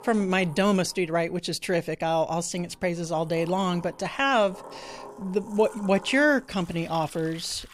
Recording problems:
household noises; faint; throughout; 20 dB below the speech

